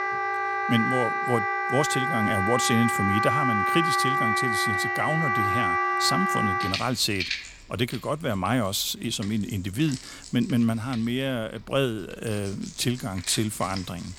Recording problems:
background music; very loud; throughout; 2 dB above the speech

